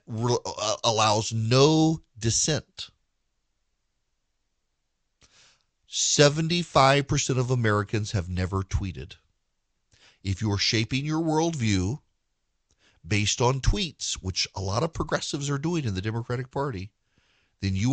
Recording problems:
high frequencies cut off; noticeable; nothing above 8 kHz
abrupt cut into speech; at the end

